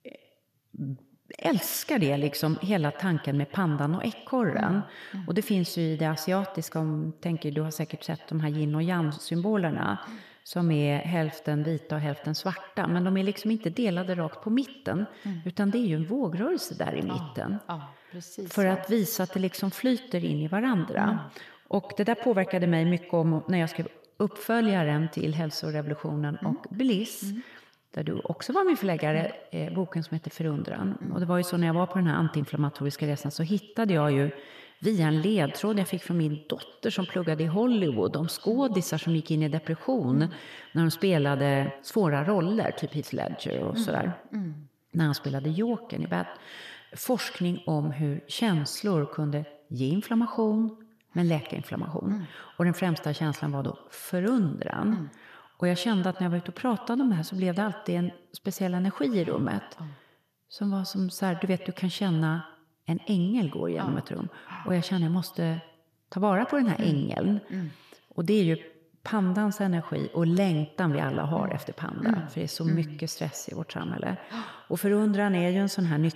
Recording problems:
echo of what is said; noticeable; throughout; 100 ms later, 15 dB below the speech

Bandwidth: 14.5 kHz